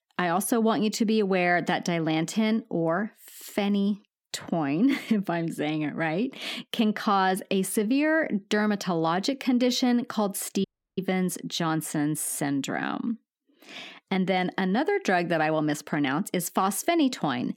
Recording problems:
audio cutting out; at 11 s

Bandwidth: 18 kHz